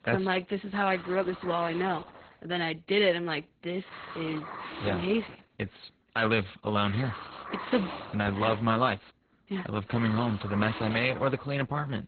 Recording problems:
garbled, watery; badly; nothing above 4 kHz
hiss; noticeable; throughout; 10 dB below the speech

